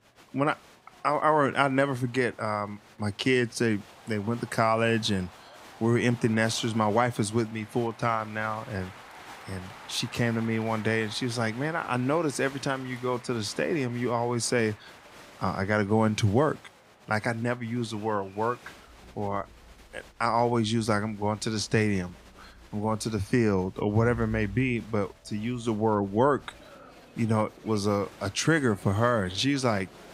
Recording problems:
crowd noise; faint; throughout; 20 dB below the speech

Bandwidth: 15.5 kHz